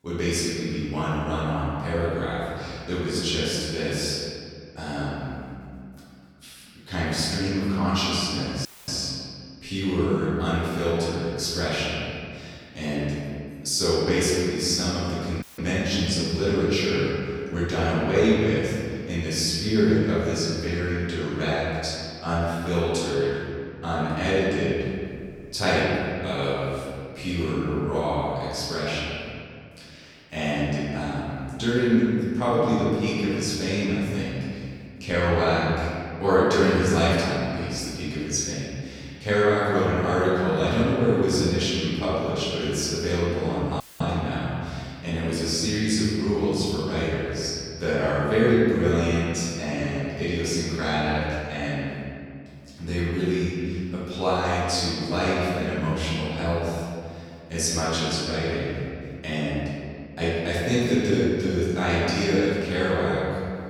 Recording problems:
room echo; strong; dies away in 2.1 s
off-mic speech; far
audio cutting out; at 8.5 s, at 15 s and at 44 s

